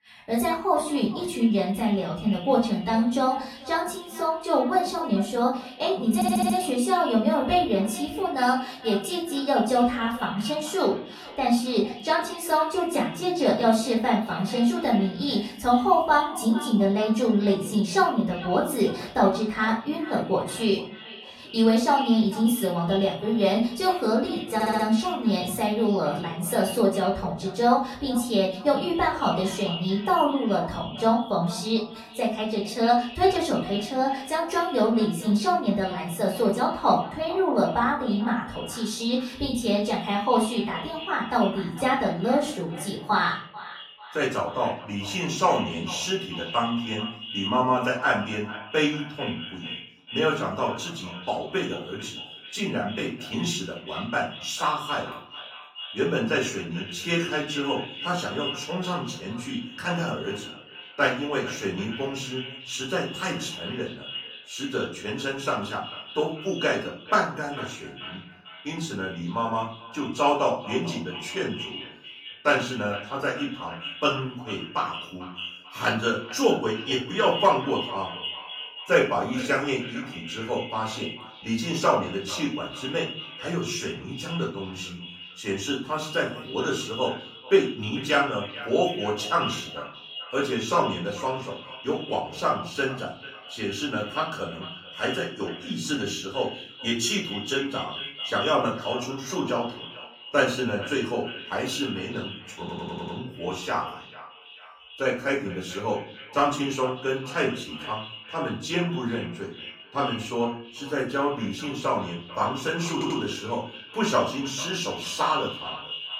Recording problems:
off-mic speech; far
echo of what is said; noticeable; throughout; 440 ms later, 15 dB below the speech
room echo; slight; dies away in 0.4 s
garbled, watery; slightly
audio stuttering; 4 times, first at 6 s

